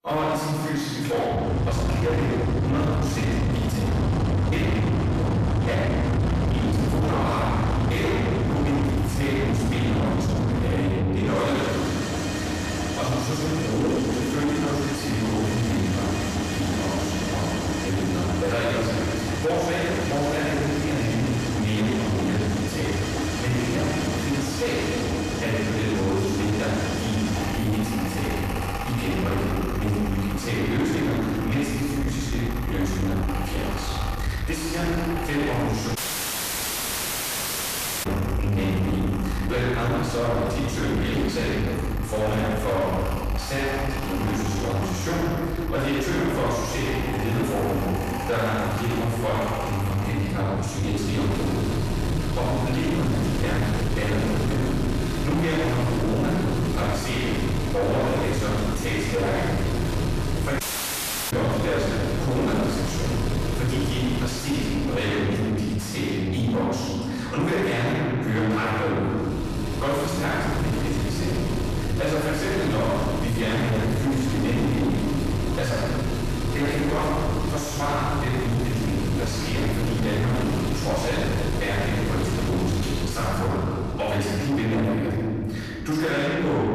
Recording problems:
distortion; heavy; 6 dB below the speech
room echo; strong; dies away in 1.6 s
off-mic speech; far
machinery noise; very faint; throughout; 2 dB below the speech
audio cutting out; at 36 s for 2 s and at 1:01 for 0.5 s

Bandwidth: 14.5 kHz